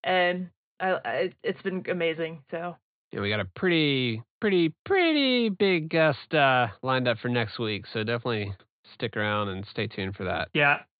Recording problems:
high frequencies cut off; severe; nothing above 4.5 kHz

